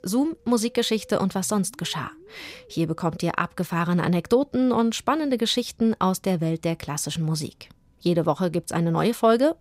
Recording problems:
background music; faint; throughout; 30 dB below the speech

